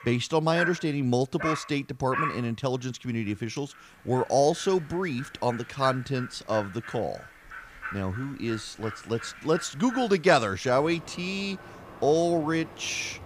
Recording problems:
animal sounds; noticeable; throughout; 10 dB below the speech

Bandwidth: 15 kHz